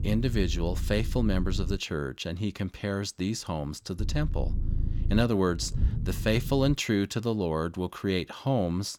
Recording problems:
low rumble; noticeable; until 2 s and from 4 to 6.5 s; 15 dB below the speech

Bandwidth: 18 kHz